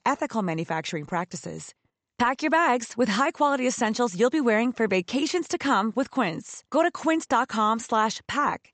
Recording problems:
high frequencies cut off; noticeable; nothing above 8 kHz

